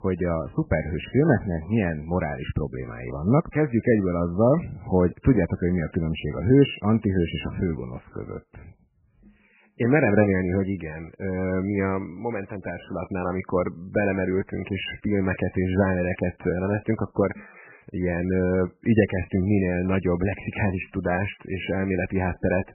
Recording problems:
garbled, watery; badly; nothing above 3 kHz

